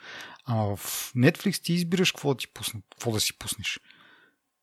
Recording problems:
none

